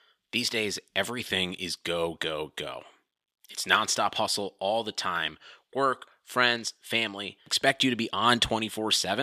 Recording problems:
thin; somewhat; fading below 550 Hz
abrupt cut into speech; at the end

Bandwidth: 14.5 kHz